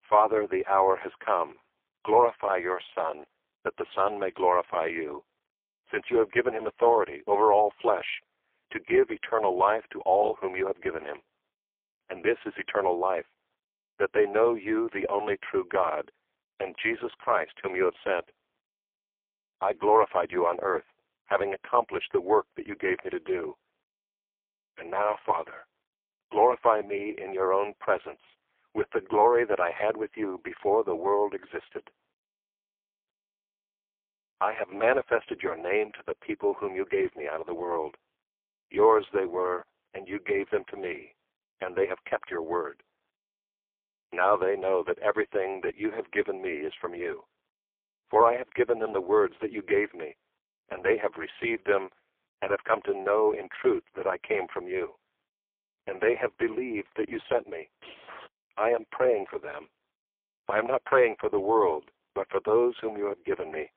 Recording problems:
phone-call audio; poor line; nothing above 3 kHz
jangling keys; faint; at 58 s; peak 15 dB below the speech

